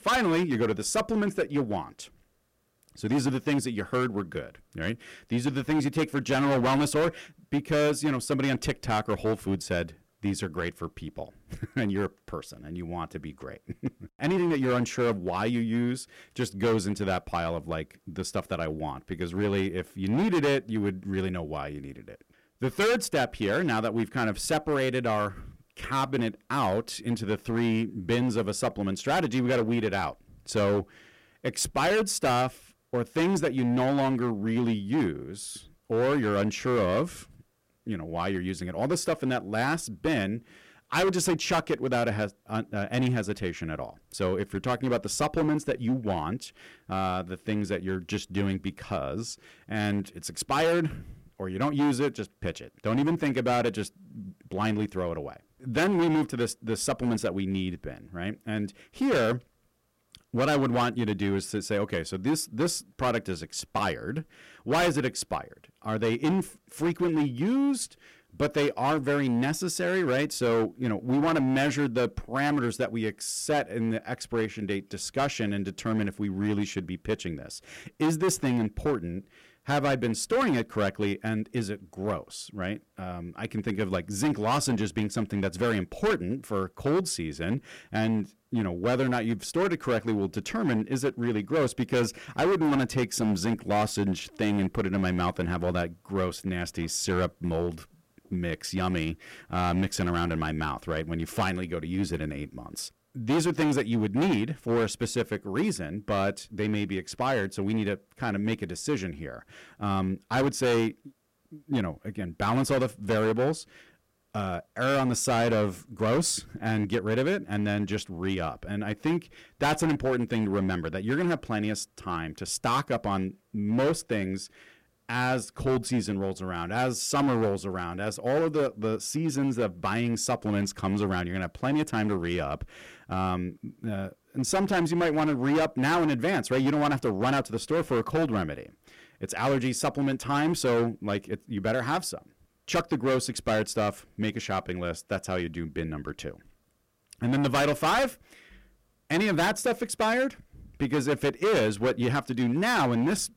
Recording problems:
distortion; heavy; 10% of the sound clipped

